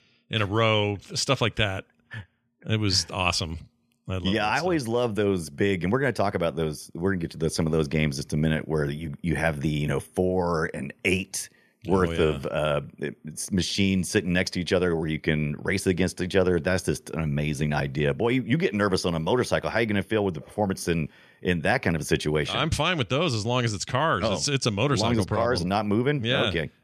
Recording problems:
none

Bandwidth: 13.5 kHz